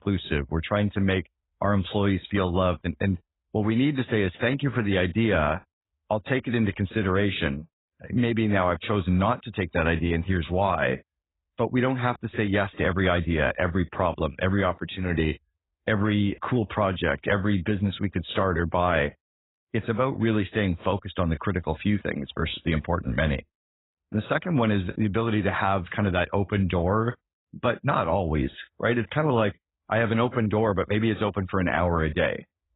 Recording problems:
garbled, watery; badly; nothing above 4 kHz

